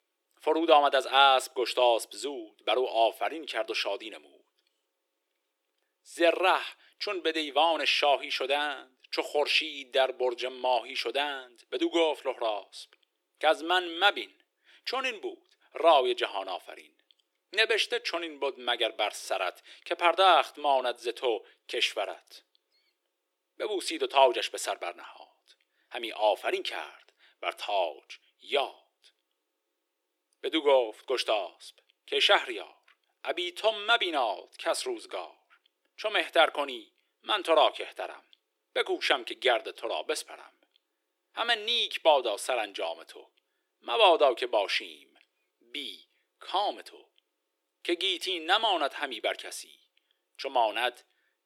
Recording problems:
thin; very; fading below 350 Hz

